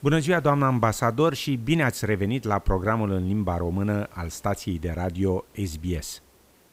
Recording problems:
hiss; faint; throughout; 30 dB below the speech

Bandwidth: 15.5 kHz